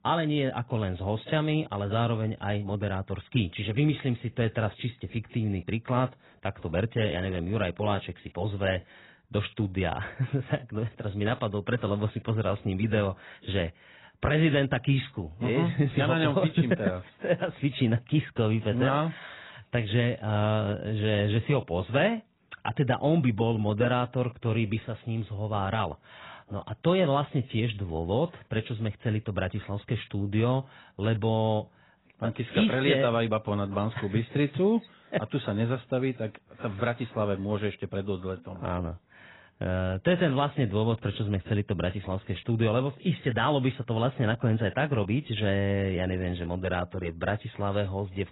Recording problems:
garbled, watery; badly; nothing above 4 kHz

